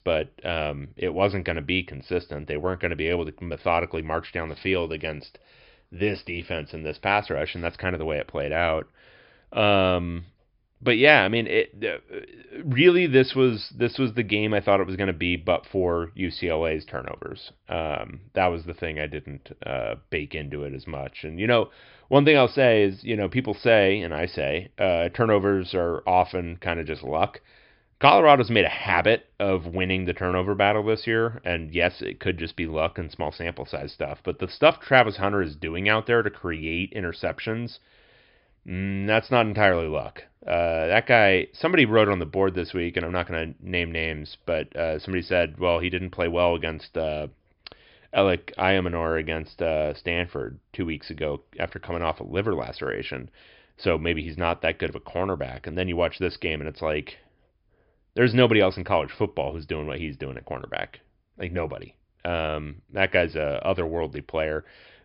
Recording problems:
high frequencies cut off; noticeable; nothing above 5.5 kHz

